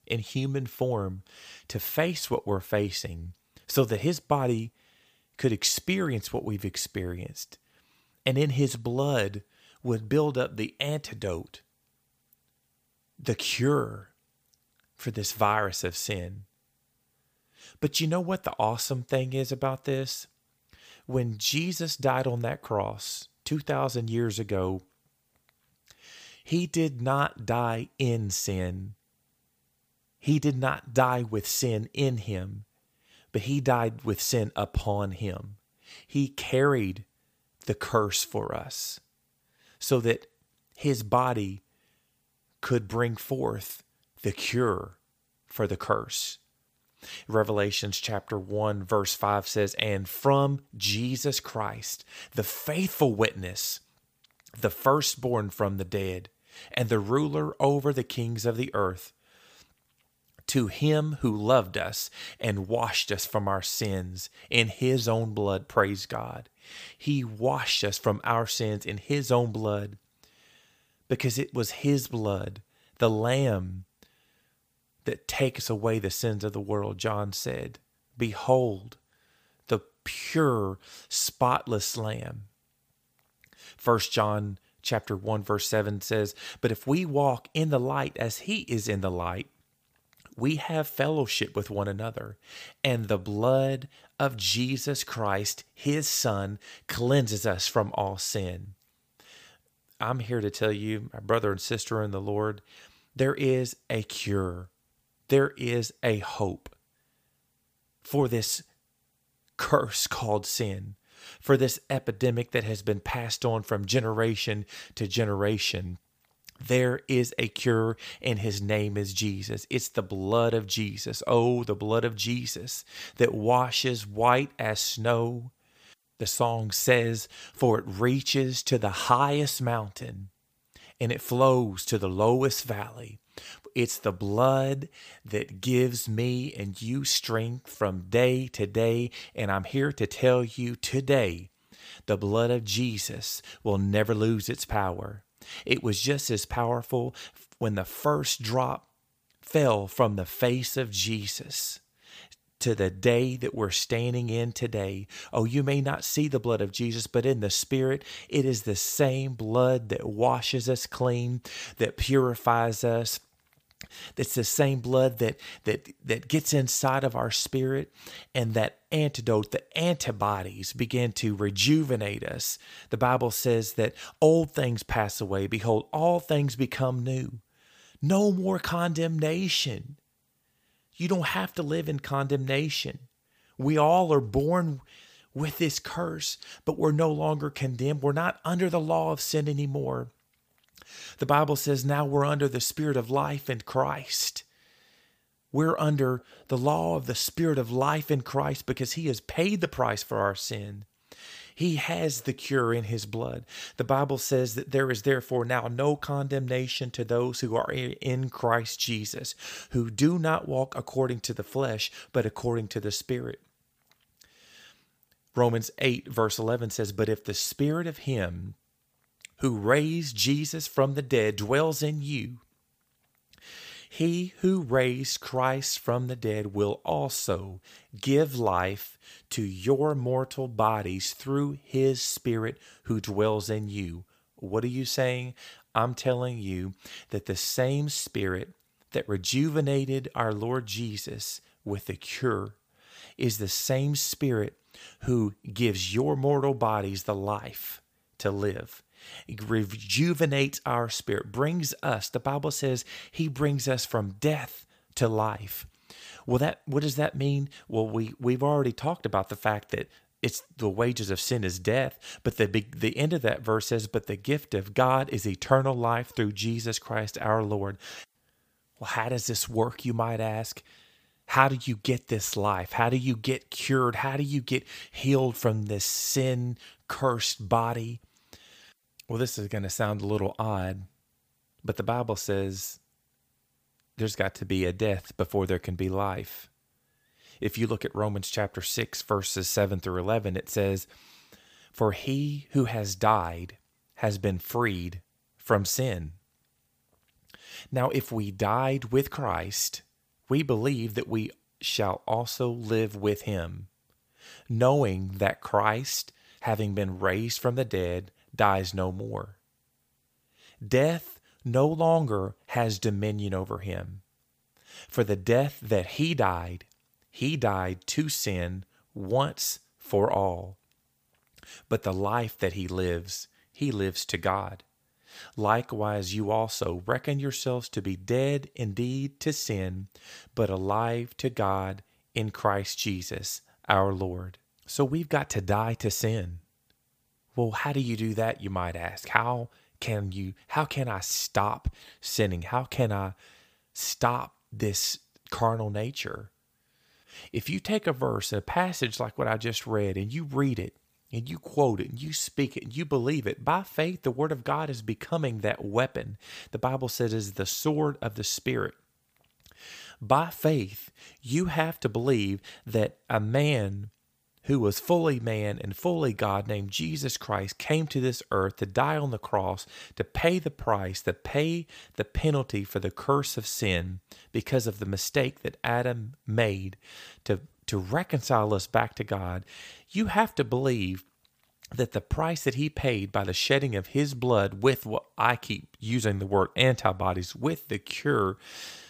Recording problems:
none

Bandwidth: 15 kHz